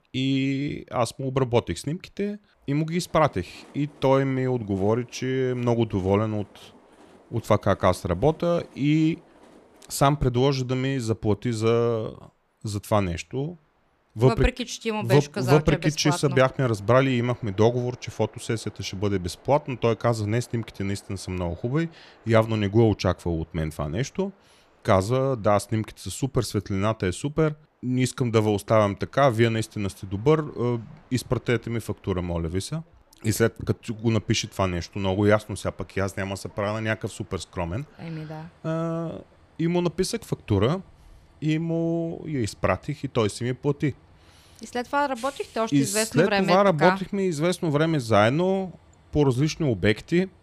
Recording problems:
train or aircraft noise; faint; throughout; 30 dB below the speech

